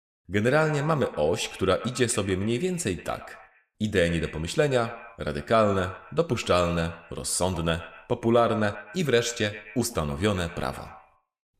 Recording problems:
echo of what is said; noticeable; throughout; 120 ms later, 15 dB below the speech

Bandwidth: 14.5 kHz